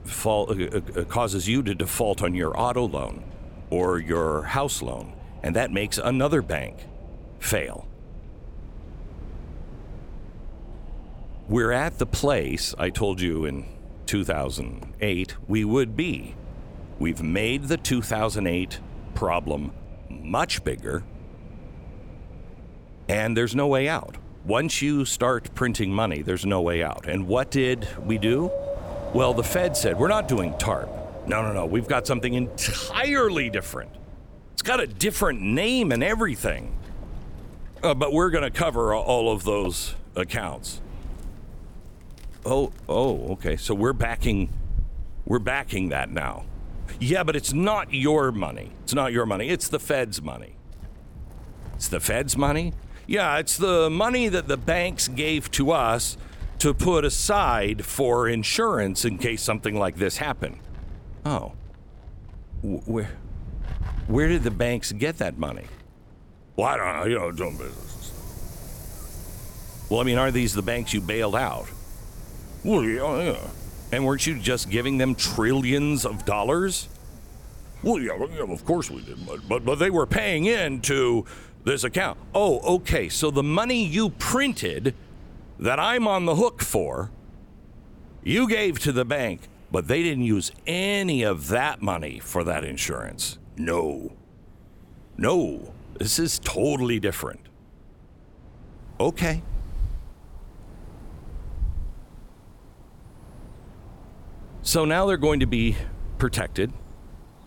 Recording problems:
wind in the background; noticeable; throughout; 15 dB below the speech

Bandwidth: 17.5 kHz